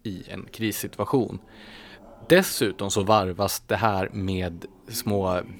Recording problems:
voice in the background; faint; throughout; 25 dB below the speech

